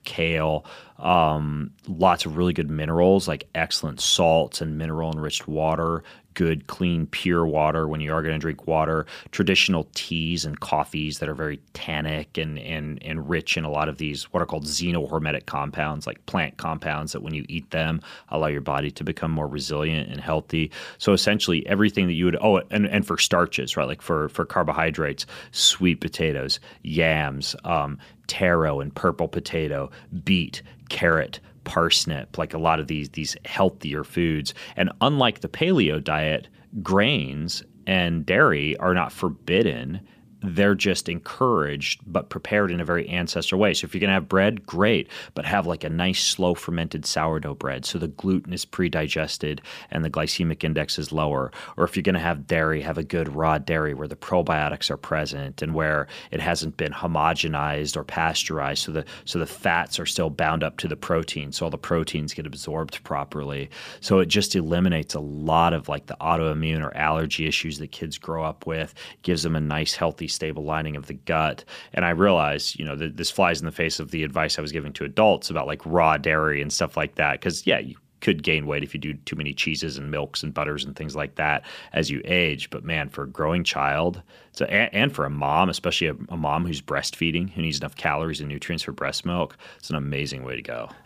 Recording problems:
none

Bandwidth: 15 kHz